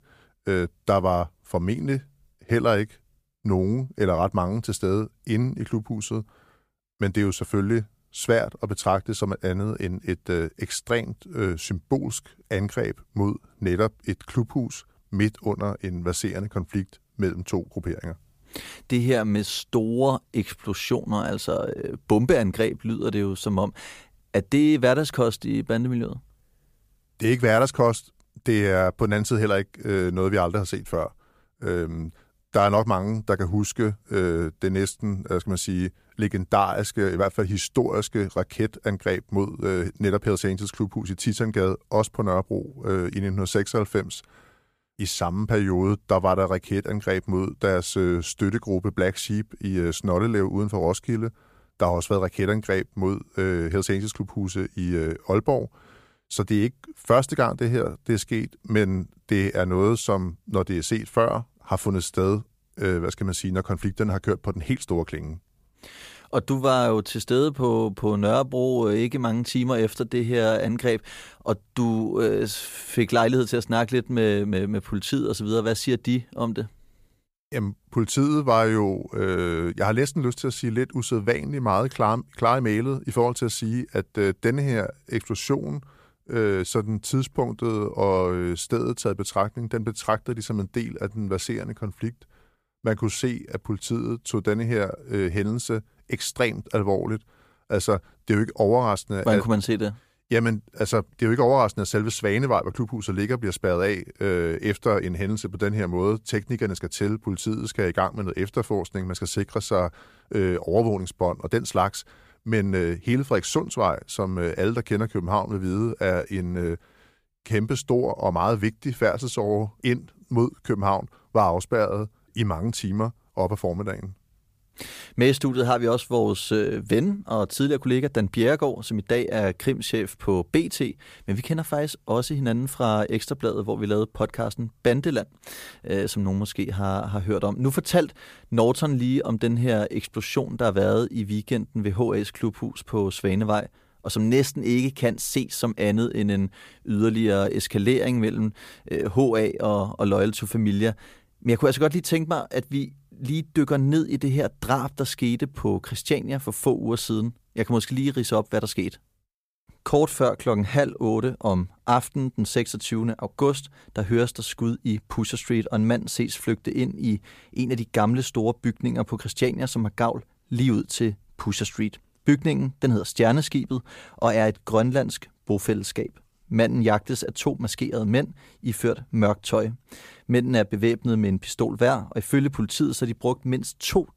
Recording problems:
none

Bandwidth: 15 kHz